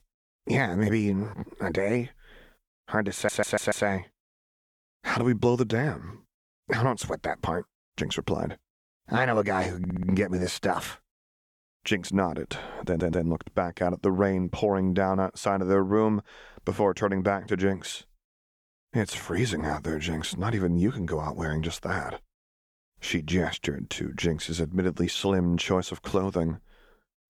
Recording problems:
audio stuttering; at 3 s, at 10 s and at 13 s

